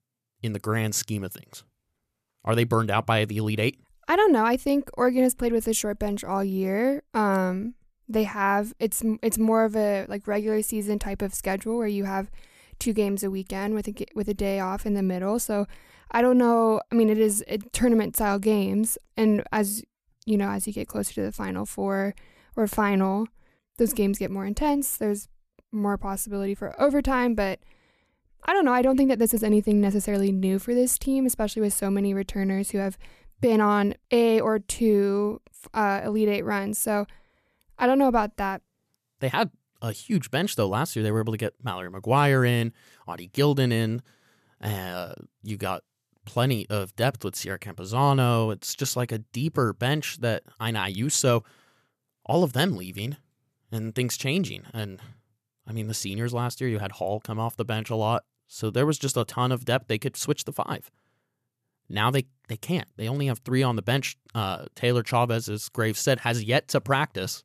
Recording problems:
none

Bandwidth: 14.5 kHz